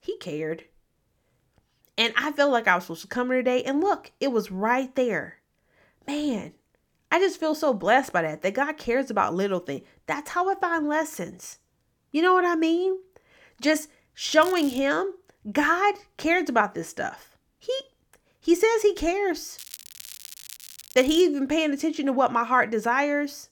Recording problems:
crackling; noticeable; at 14 s and from 20 to 21 s; 15 dB below the speech

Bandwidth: 18 kHz